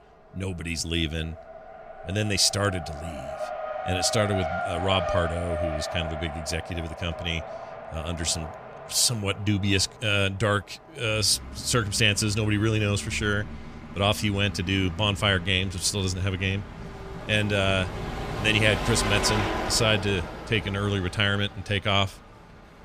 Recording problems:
traffic noise; loud; throughout; 9 dB below the speech

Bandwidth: 15 kHz